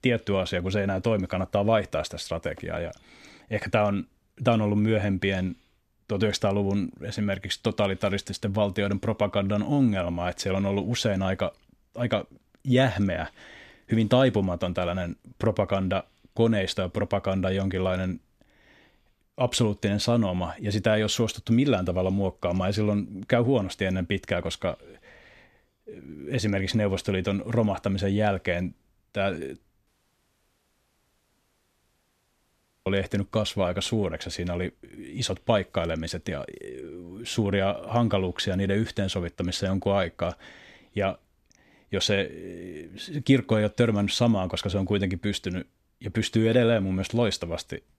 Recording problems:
audio cutting out; at 30 s for 3 s

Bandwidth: 14 kHz